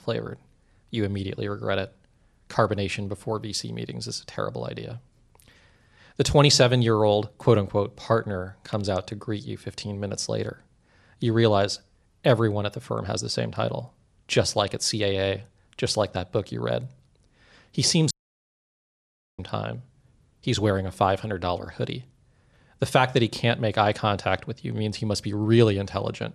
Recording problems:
audio cutting out; at 18 s for 1.5 s

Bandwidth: 13.5 kHz